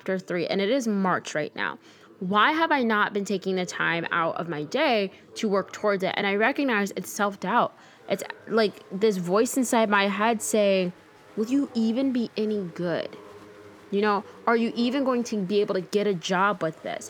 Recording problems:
chatter from many people; faint; throughout; 25 dB below the speech

